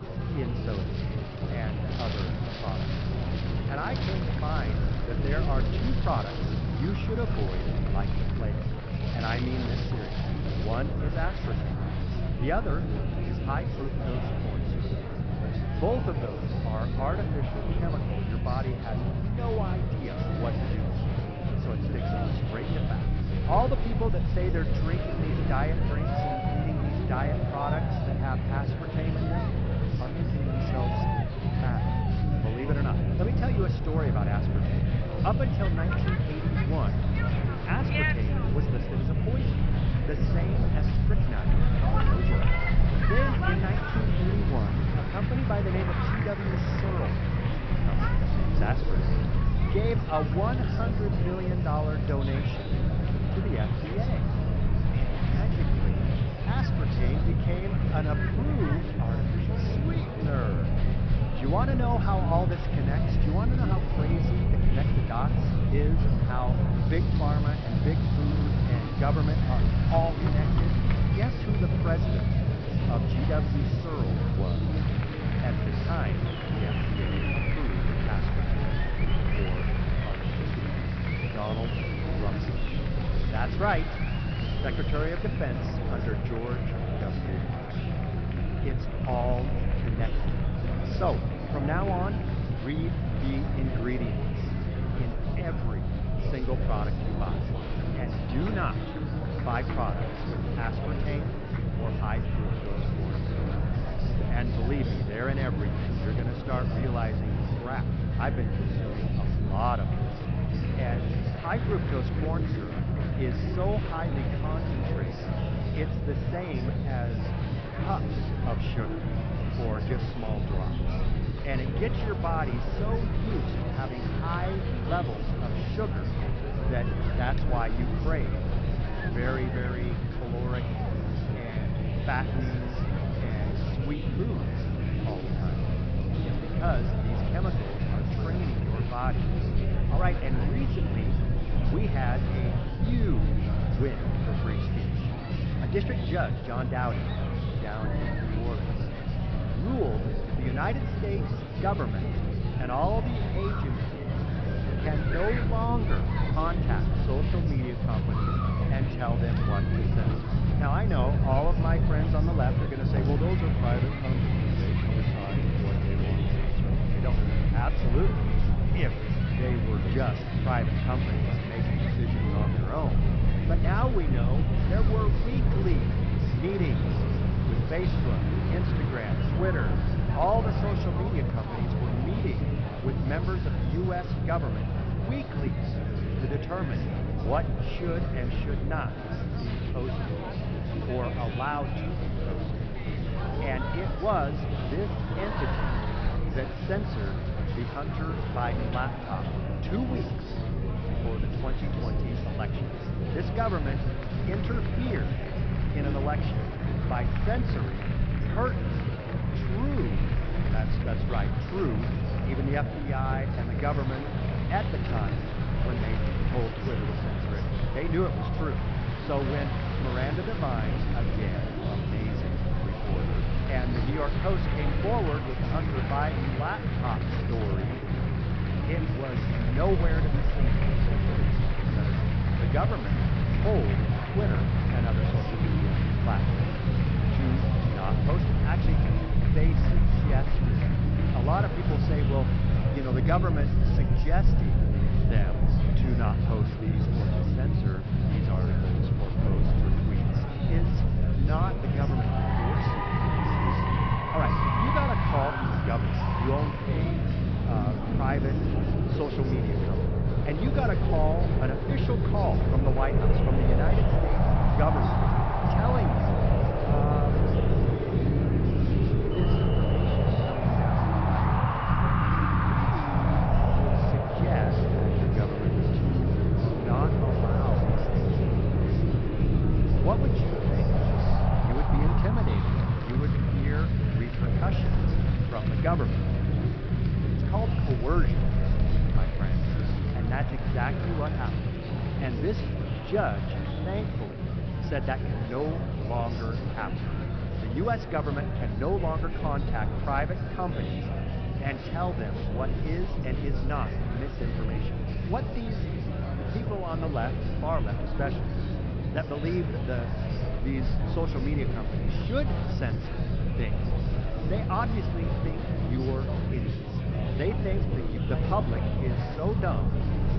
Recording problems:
high frequencies cut off; noticeable; nothing above 5.5 kHz
echo of what is said; faint; throughout; 90 ms later, 20 dB below the speech
wind in the background; loud; throughout; 6 dB below the speech
murmuring crowd; loud; throughout; 2 dB below the speech
low rumble; loud; throughout; 6 dB below the speech

